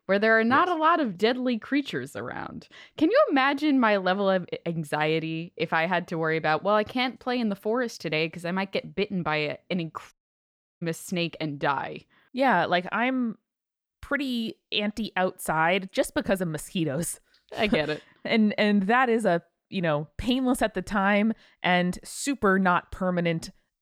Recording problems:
audio cutting out; at 10 s for 0.5 s

